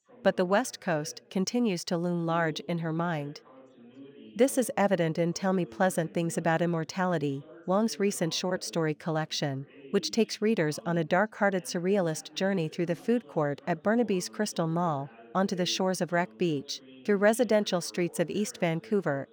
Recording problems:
background chatter; faint; throughout; 2 voices, 25 dB below the speech

